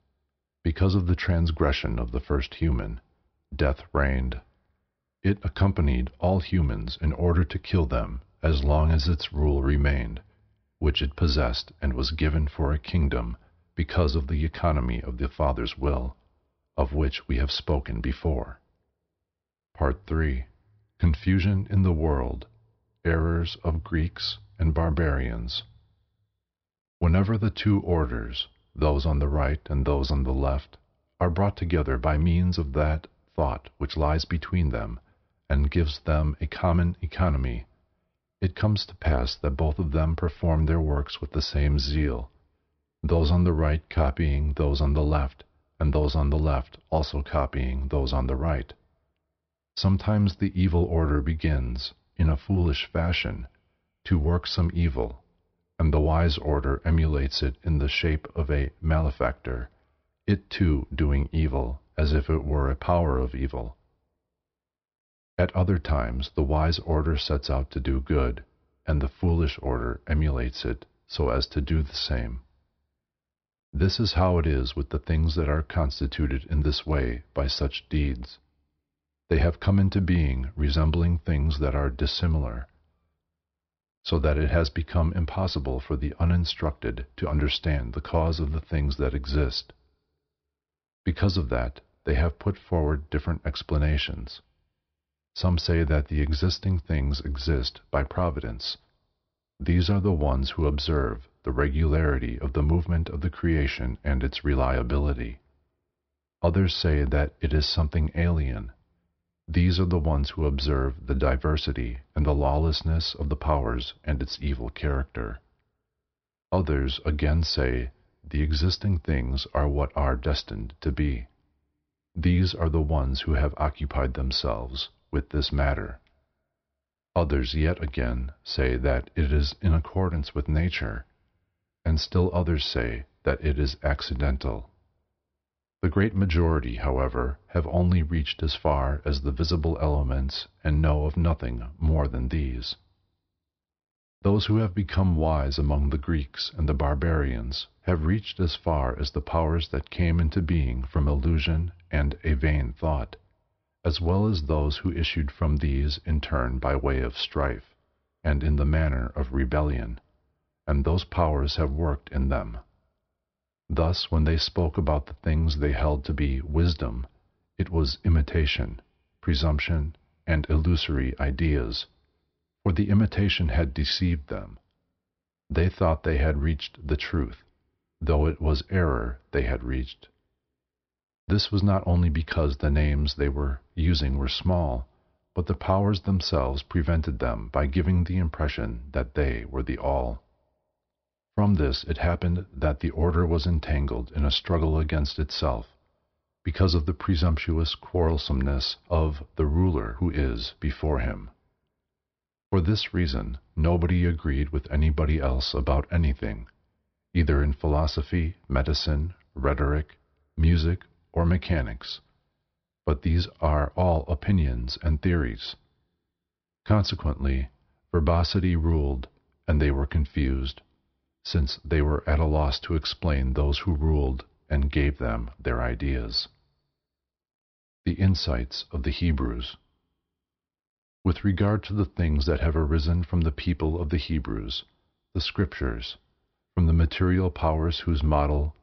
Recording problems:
high frequencies cut off; noticeable; nothing above 5.5 kHz

